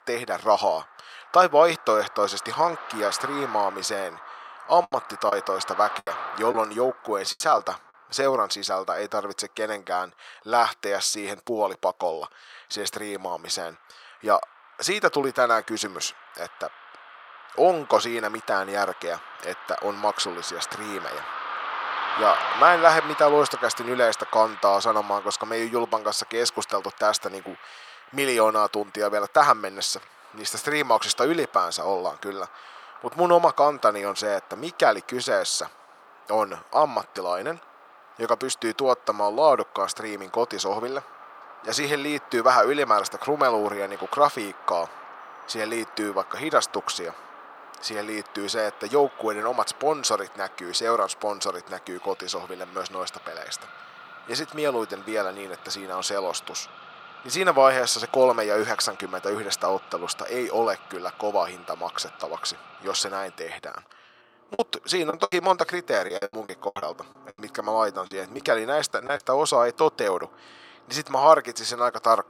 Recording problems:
thin; very; fading below 700 Hz
traffic noise; noticeable; throughout; 15 dB below the speech
choppy; very; from 5 to 7.5 s and from 1:05 to 1:09; 14% of the speech affected

